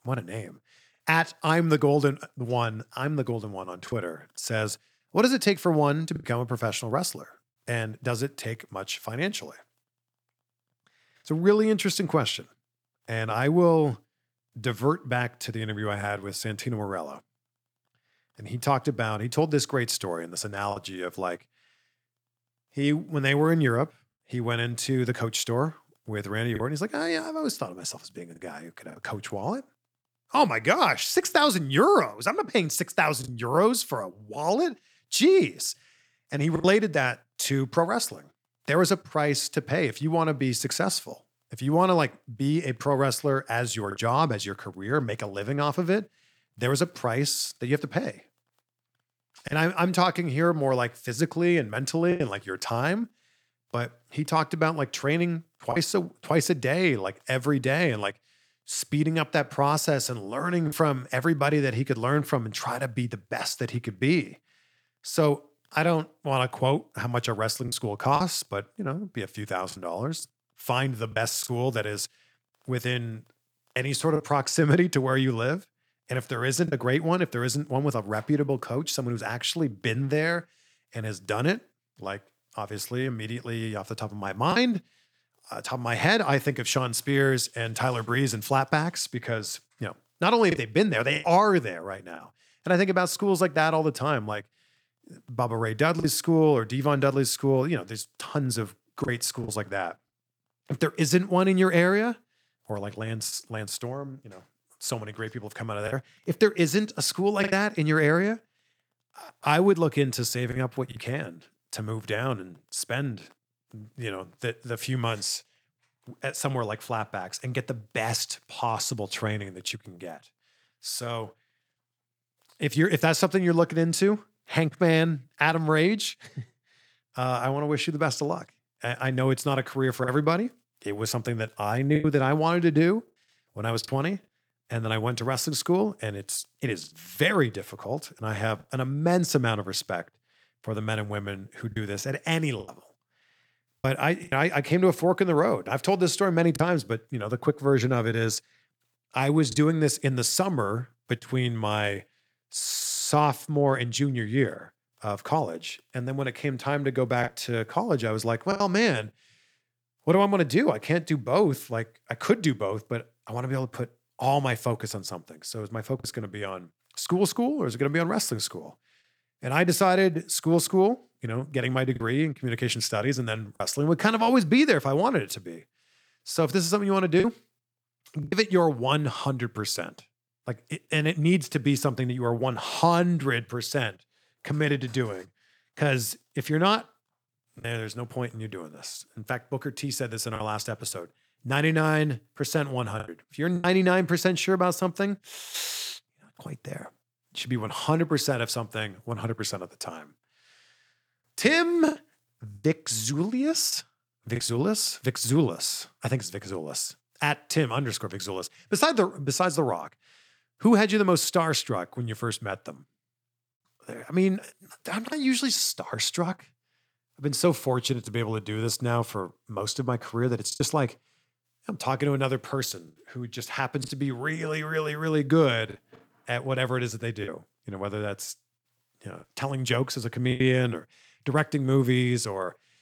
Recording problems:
choppy; occasionally; 2% of the speech affected

